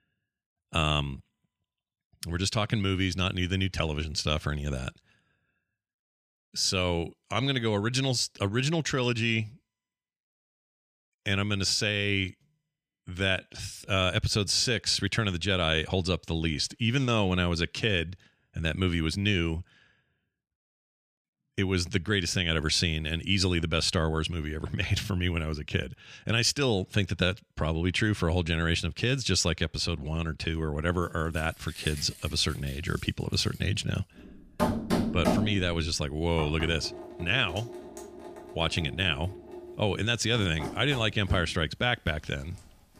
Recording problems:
household noises; loud; from 31 s on; 8 dB below the speech

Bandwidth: 14.5 kHz